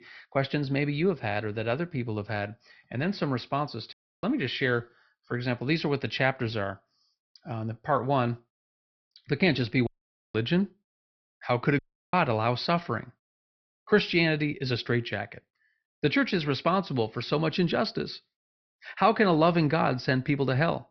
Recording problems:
high frequencies cut off; noticeable; nothing above 5.5 kHz
audio cutting out; at 4 s, at 10 s and at 12 s

